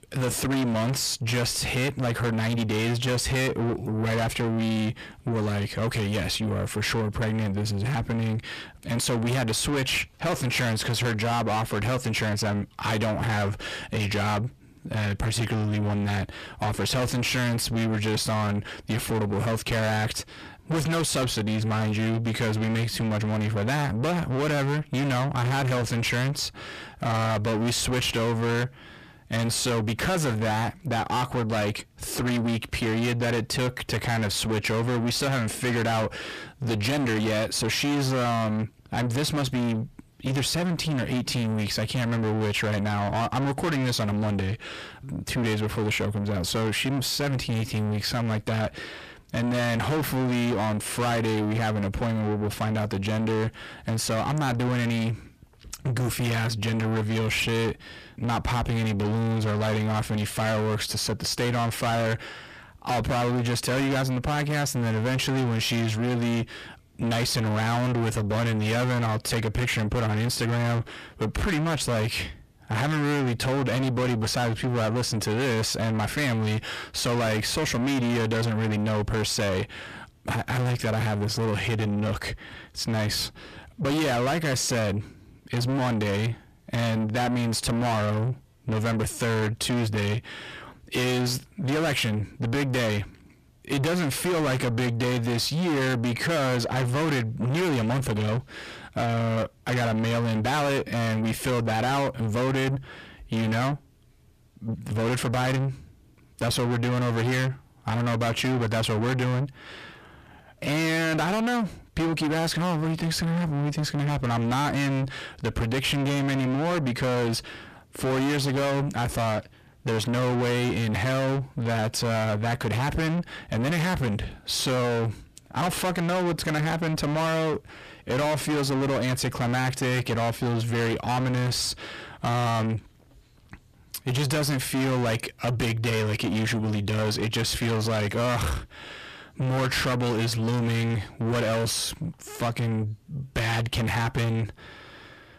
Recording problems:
distortion; heavy; 6 dB below the speech

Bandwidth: 14.5 kHz